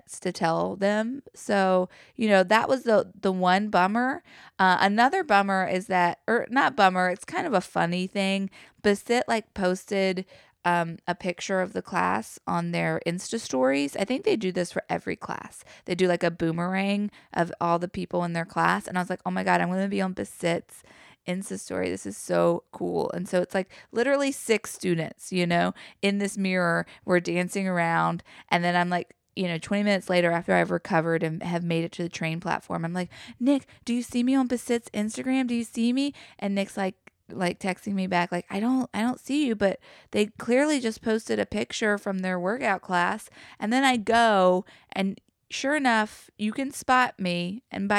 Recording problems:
abrupt cut into speech; at the end

